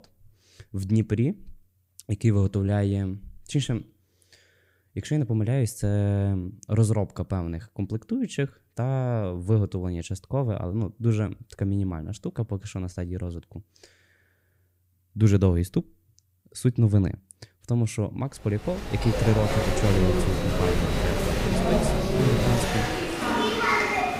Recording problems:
crowd noise; very loud; from 19 s on; 1 dB above the speech

